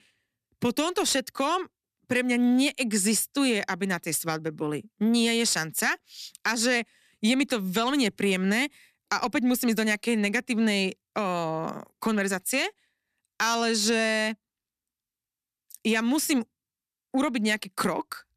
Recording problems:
none

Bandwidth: 14 kHz